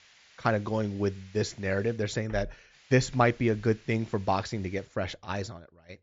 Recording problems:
high frequencies cut off; noticeable; nothing above 7.5 kHz
hiss; faint; until 2 s and from 2.5 to 5 s; 25 dB below the speech

